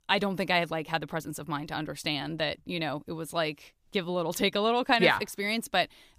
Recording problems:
none

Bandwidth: 15 kHz